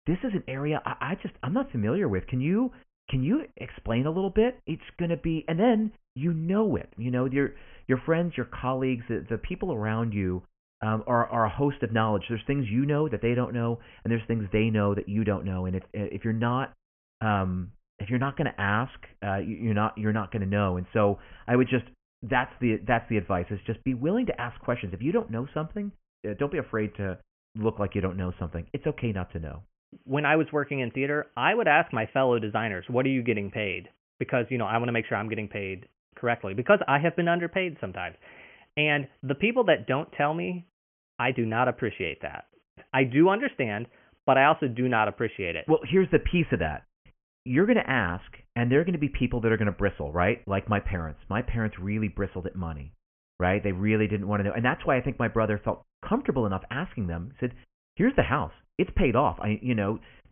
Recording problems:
high frequencies cut off; severe; nothing above 3 kHz

